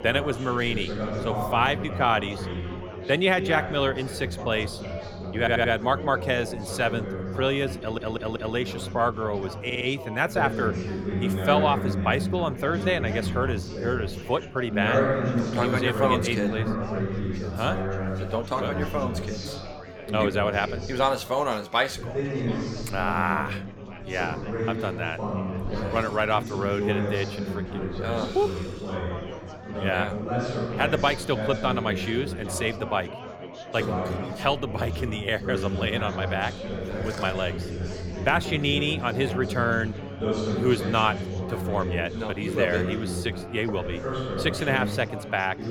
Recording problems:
chatter from many people; loud; throughout; 4 dB below the speech
audio stuttering; at 5.5 s, at 8 s and at 9.5 s

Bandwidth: 17.5 kHz